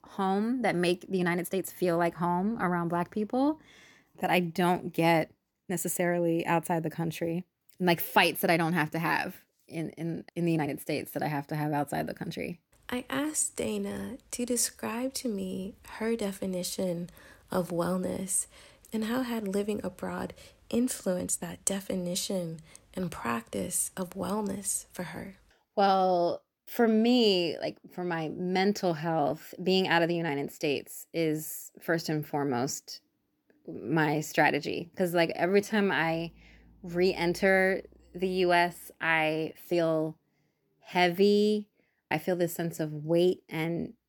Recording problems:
uneven, jittery; strongly; from 1 to 43 s

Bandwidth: 18.5 kHz